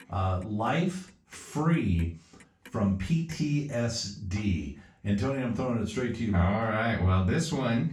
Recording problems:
off-mic speech; far
room echo; slight; dies away in 0.3 s
household noises; faint; throughout; 30 dB below the speech

